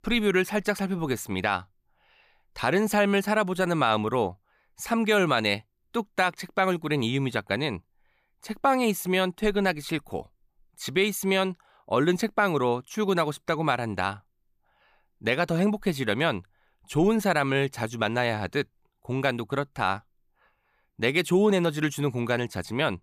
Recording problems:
none

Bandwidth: 15 kHz